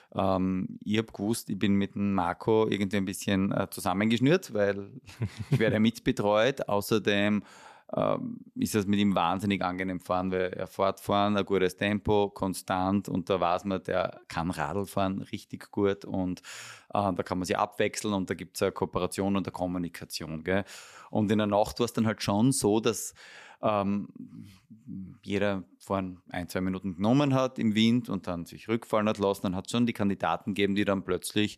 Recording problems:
none

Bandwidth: 14 kHz